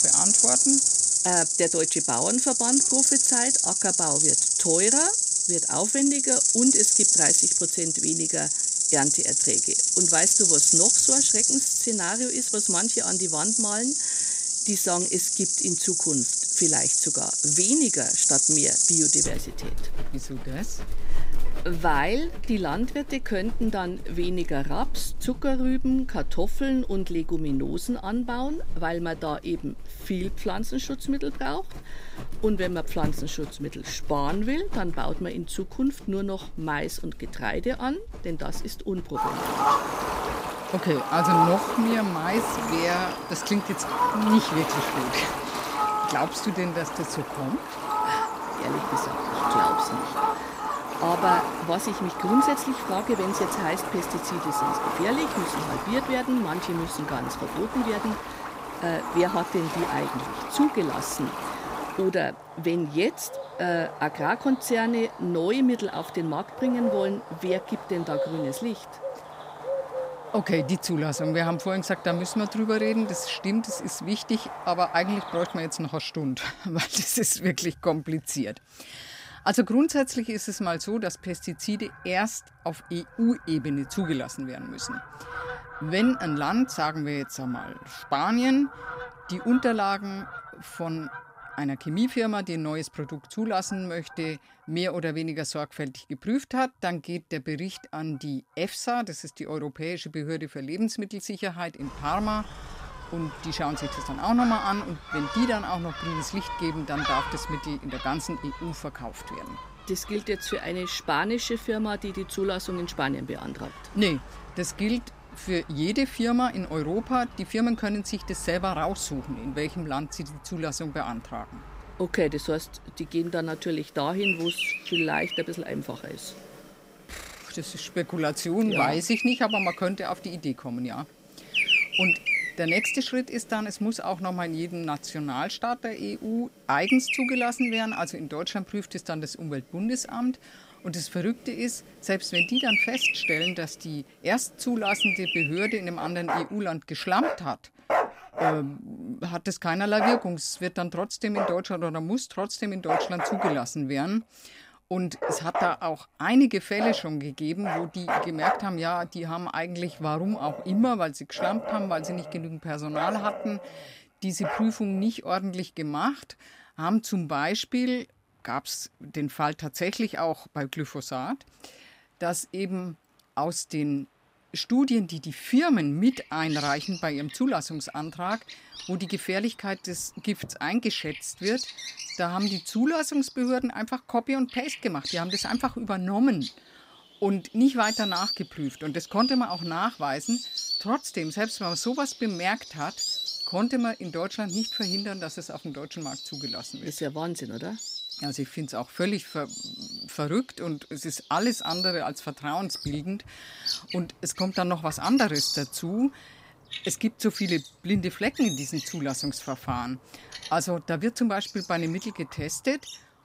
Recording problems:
animal sounds; very loud; throughout; 4 dB above the speech

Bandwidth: 15.5 kHz